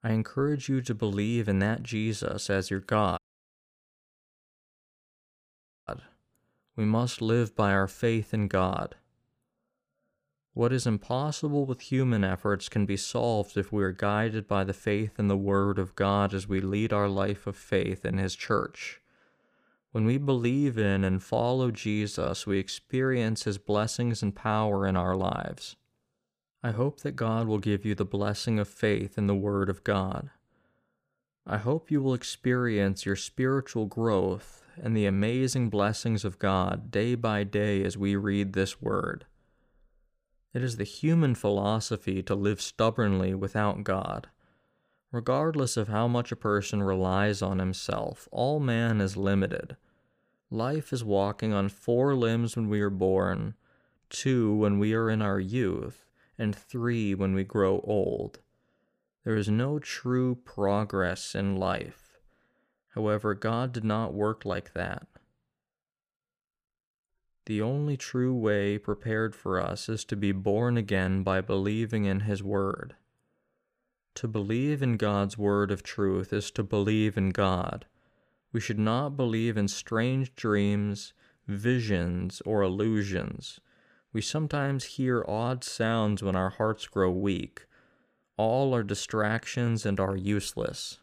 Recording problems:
audio cutting out; at 3 s for 2.5 s

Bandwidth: 15 kHz